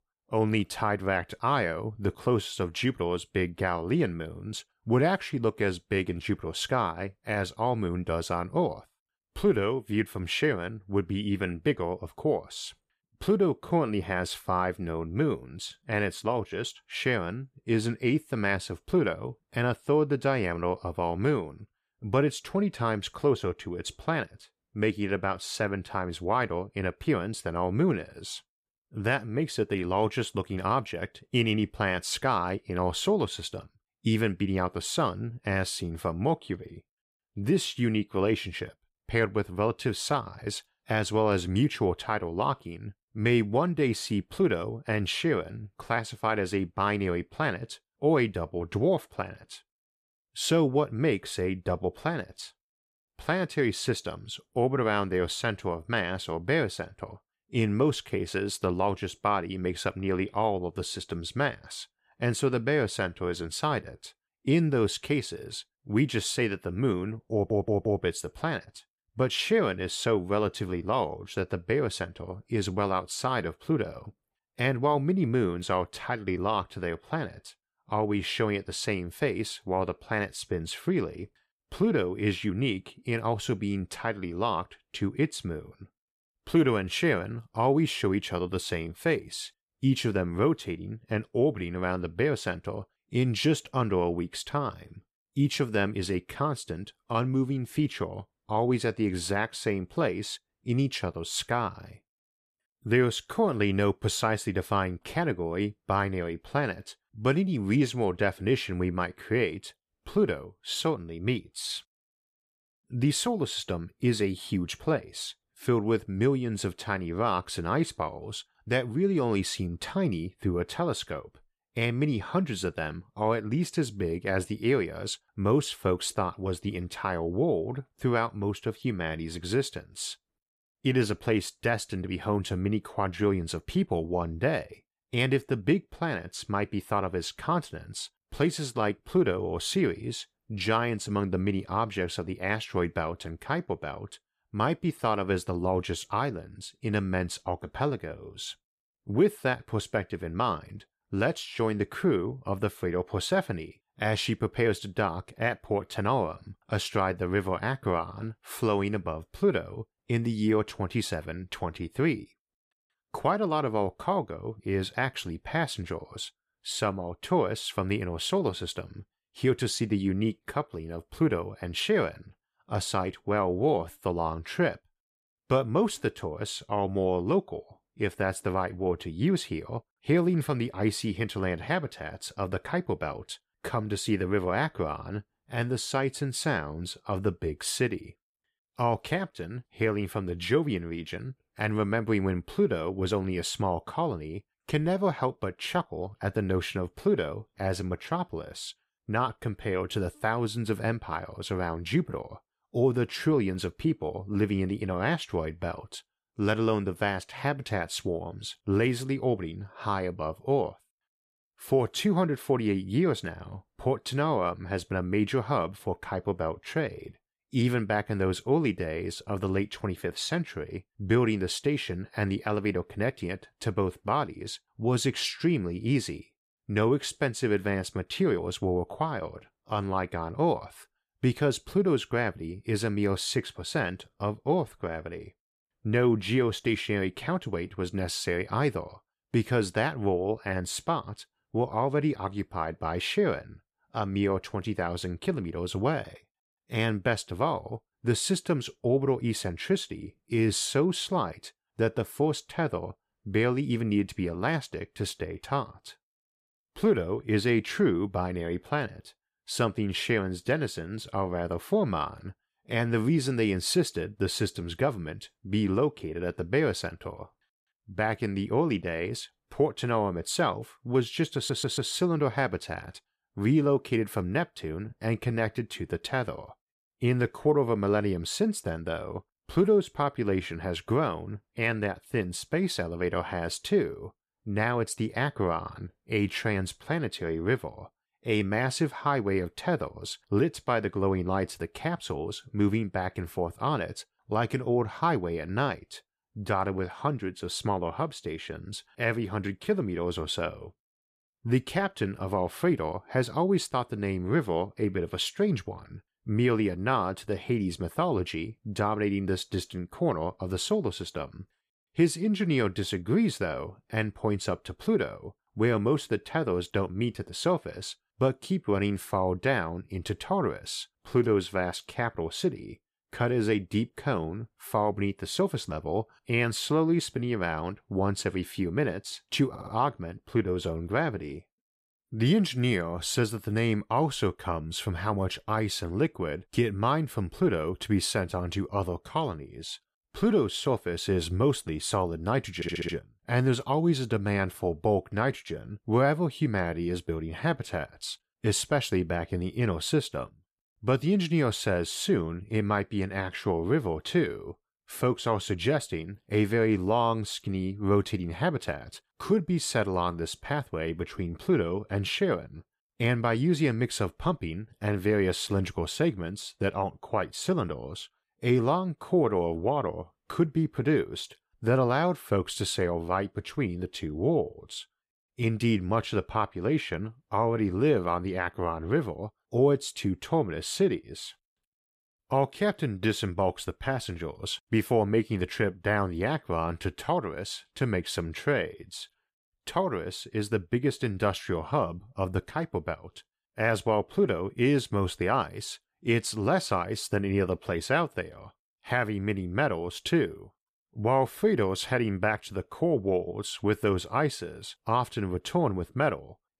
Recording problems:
audio stuttering; 4 times, first at 1:07

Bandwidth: 14.5 kHz